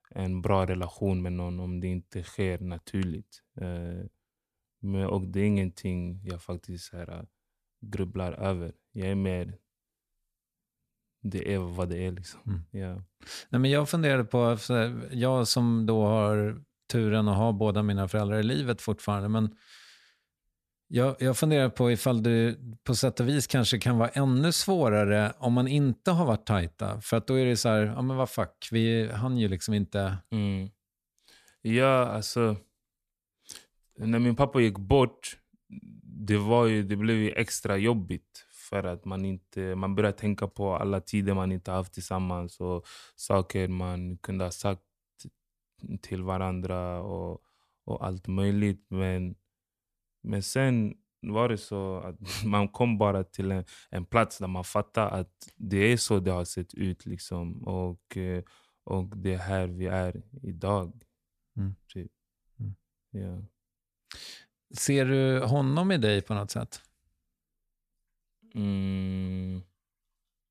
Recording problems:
none

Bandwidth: 14.5 kHz